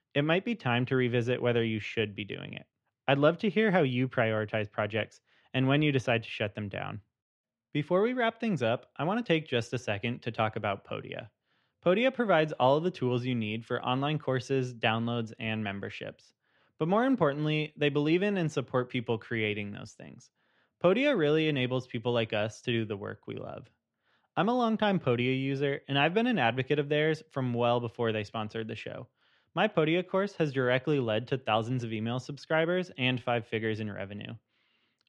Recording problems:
muffled; slightly; fading above 3 kHz

